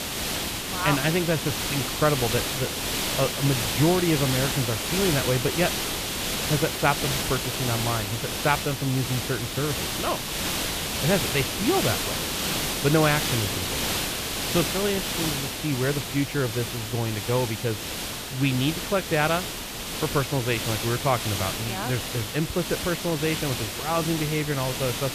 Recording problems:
high frequencies cut off; severe; nothing above 4 kHz
hiss; loud; throughout; 1 dB below the speech

